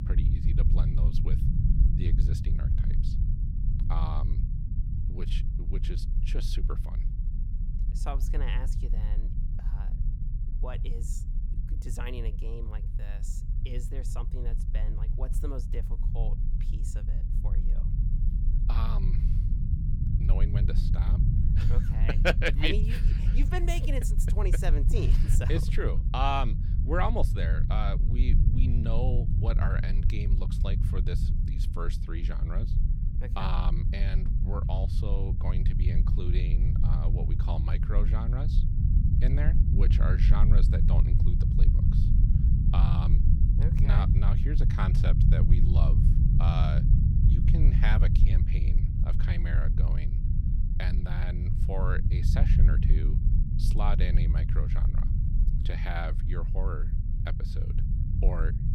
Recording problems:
low rumble; loud; throughout; 5 dB below the speech

